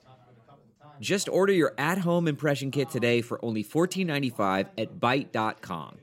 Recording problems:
background chatter; faint; throughout; 4 voices, 25 dB below the speech

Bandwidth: 16 kHz